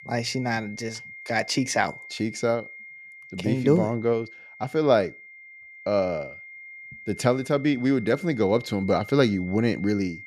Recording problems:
high-pitched whine; noticeable; throughout; 2 kHz, 15 dB below the speech

